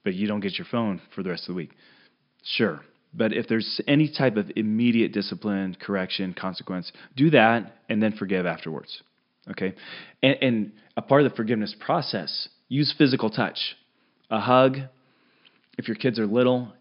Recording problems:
high frequencies cut off; noticeable; nothing above 5.5 kHz

